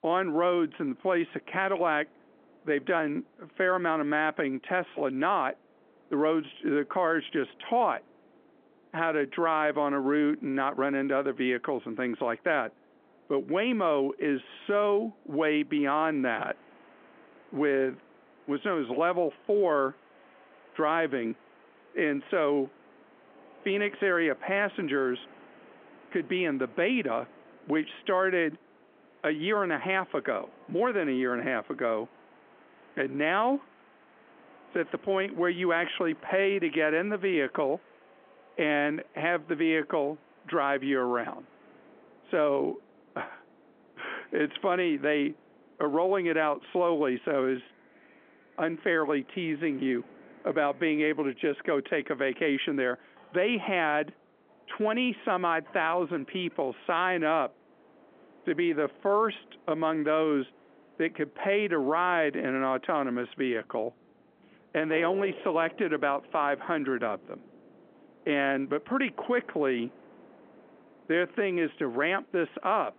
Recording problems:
phone-call audio; nothing above 3.5 kHz
wind in the background; faint; throughout; 25 dB below the speech

